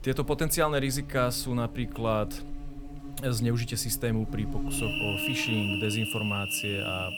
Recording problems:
animal sounds; loud; throughout; 4 dB below the speech

